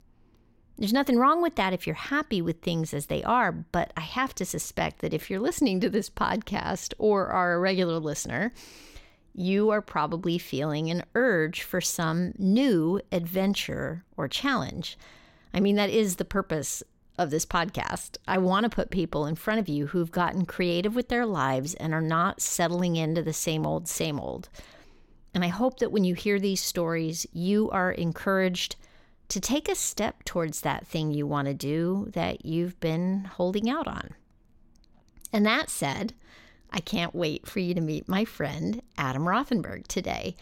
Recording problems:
none

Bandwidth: 16.5 kHz